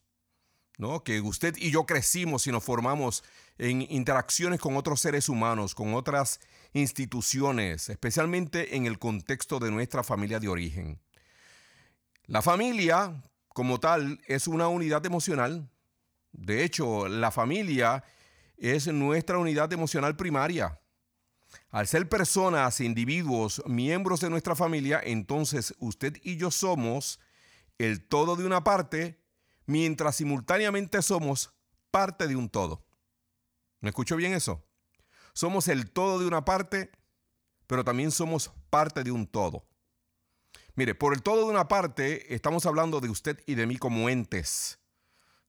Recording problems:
none

